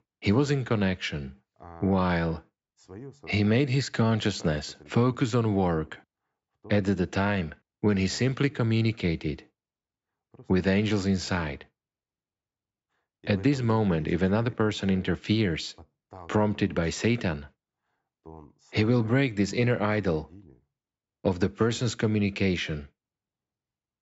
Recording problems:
high frequencies cut off; noticeable; nothing above 8 kHz

